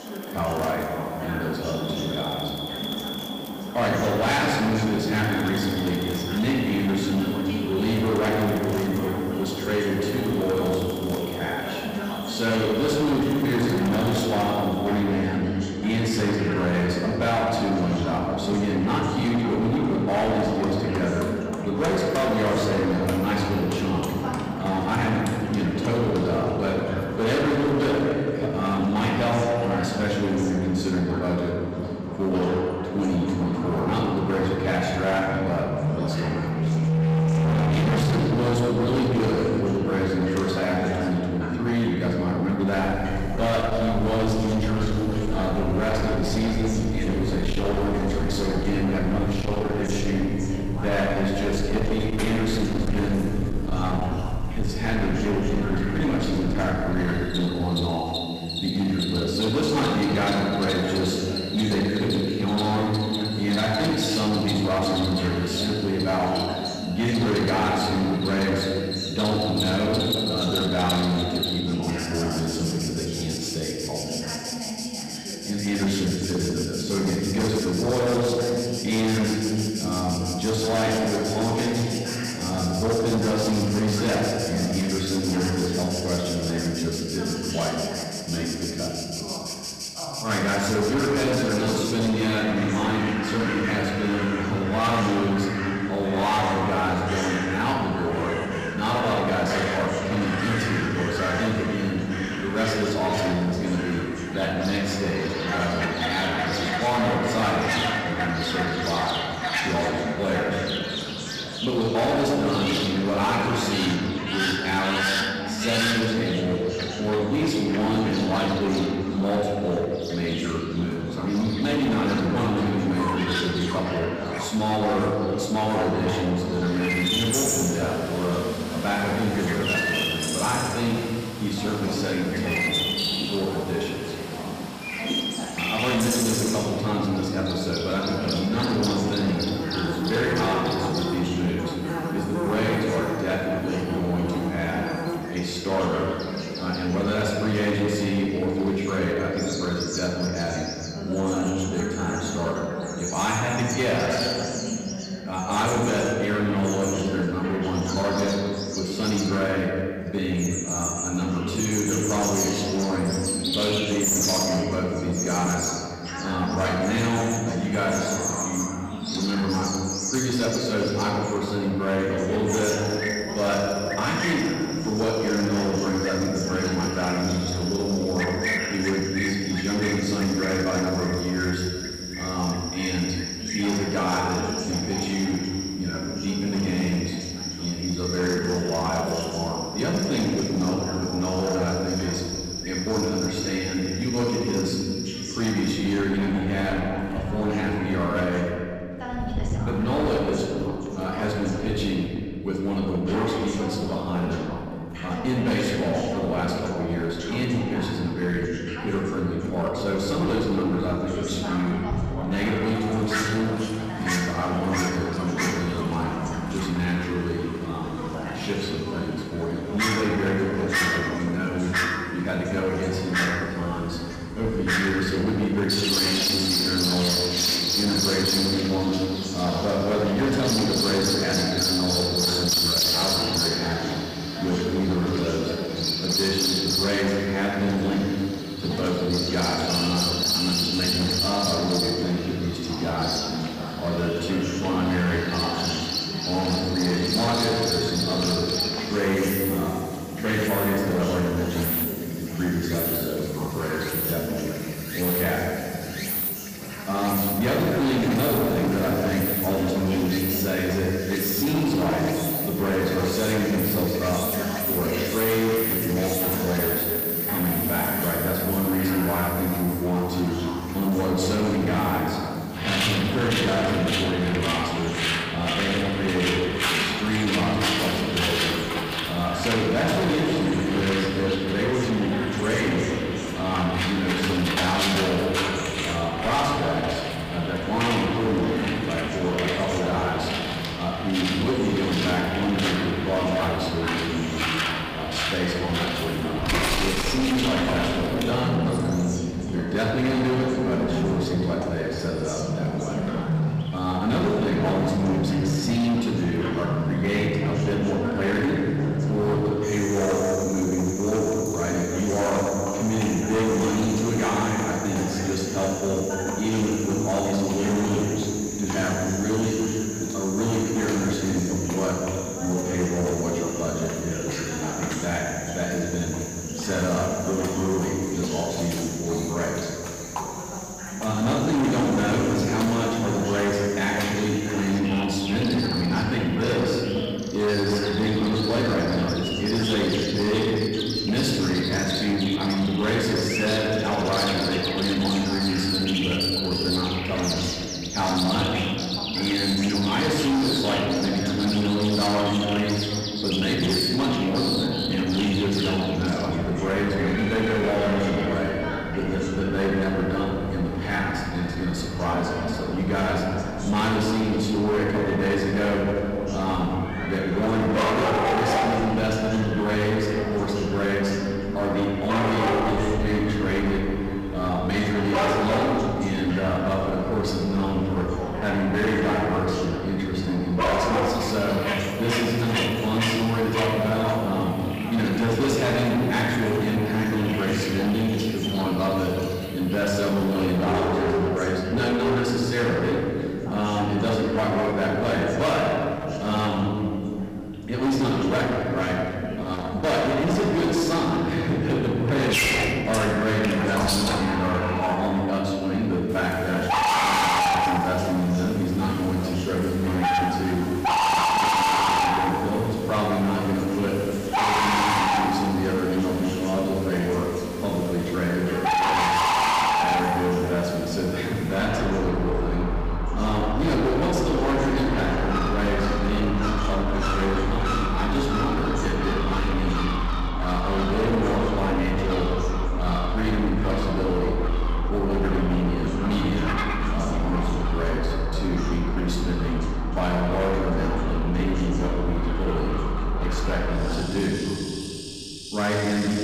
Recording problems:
distortion; heavy; 18% of the sound clipped
off-mic speech; far
room echo; noticeable; dies away in 2.2 s
animal sounds; loud; throughout; 4 dB below the speech
voice in the background; noticeable; throughout; 10 dB below the speech

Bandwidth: 15 kHz